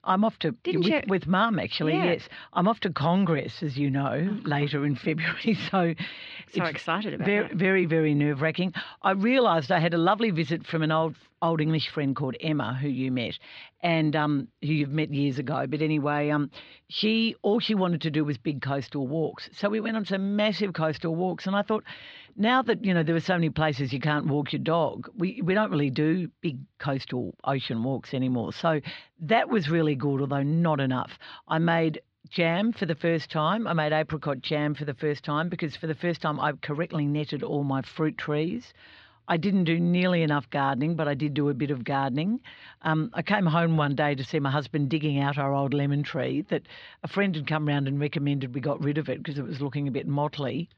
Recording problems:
muffled; slightly; fading above 4 kHz

